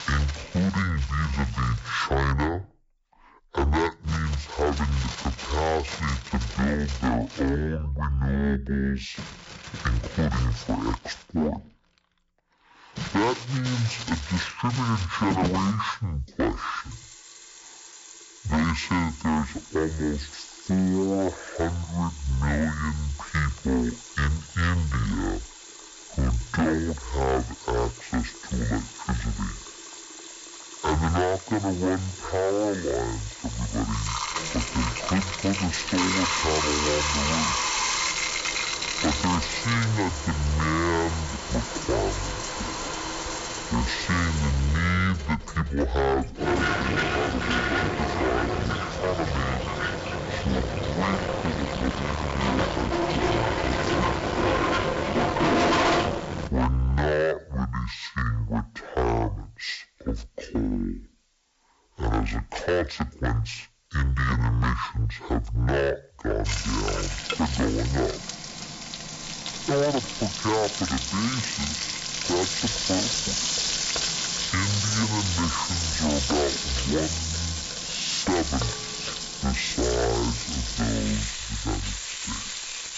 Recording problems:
distortion; heavy; 13% of the sound clipped
wrong speed and pitch; too slow and too low; 0.5 times normal speed
household noises; loud; throughout; 1 dB below the speech

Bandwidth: 7.5 kHz